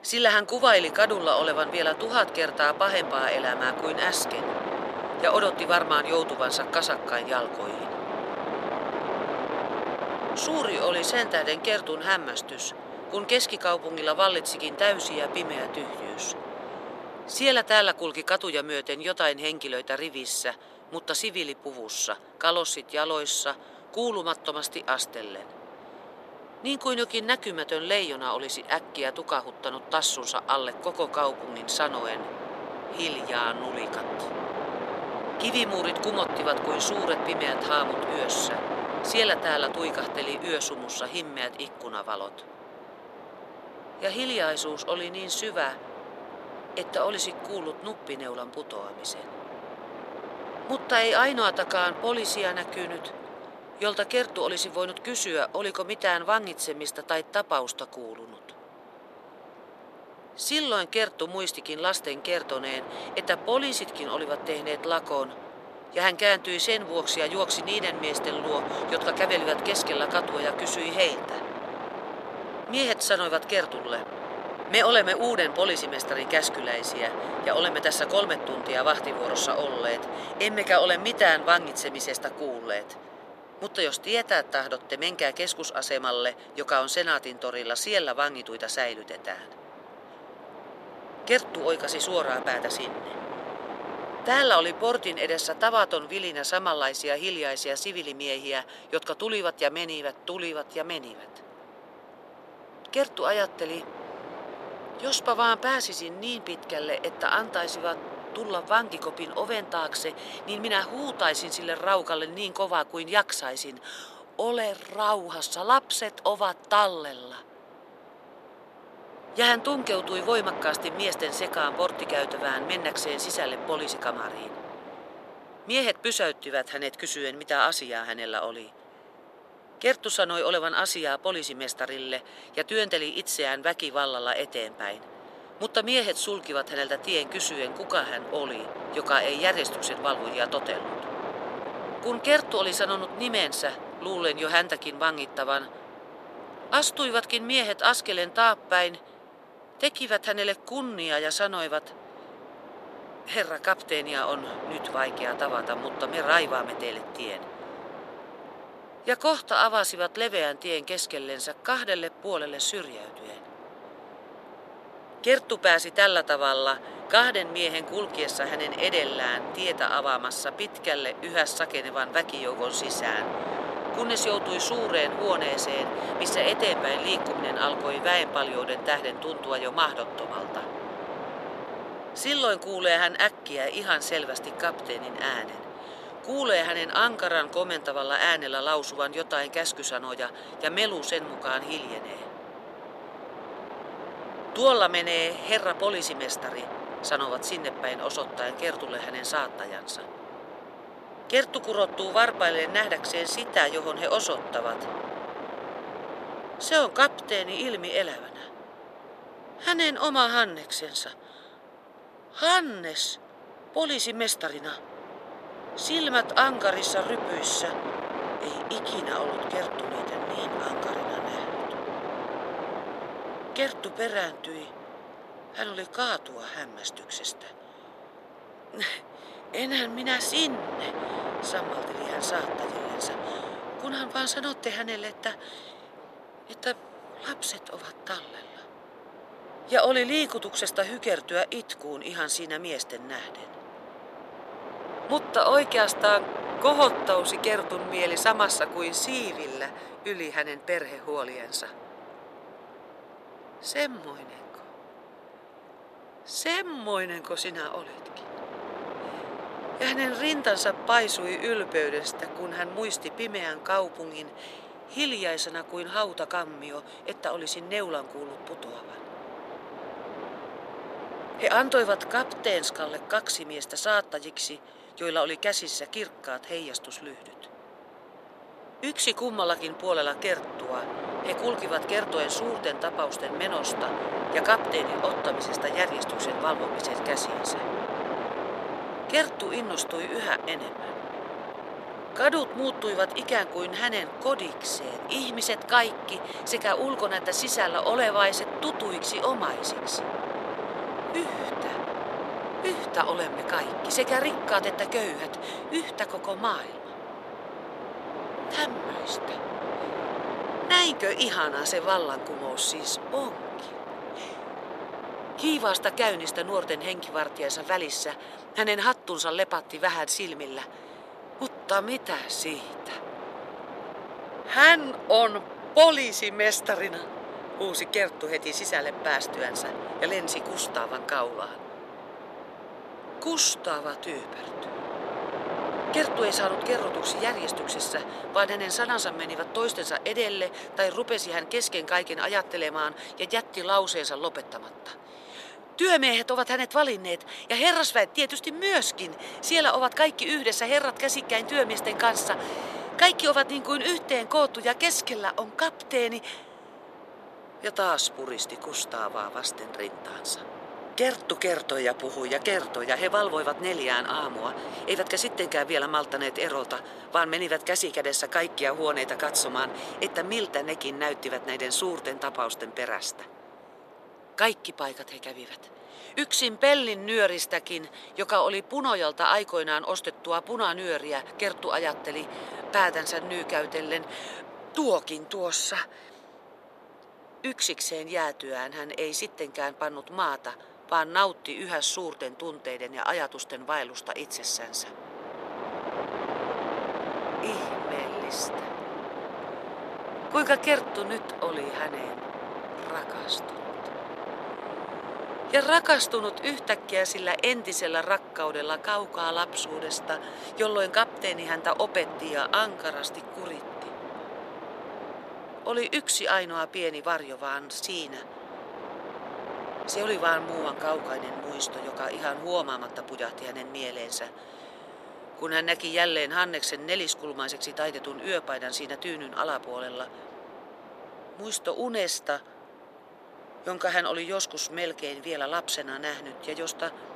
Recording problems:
thin; somewhat; fading below 600 Hz
wind noise on the microphone; occasional gusts; 10 dB below the speech

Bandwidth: 13.5 kHz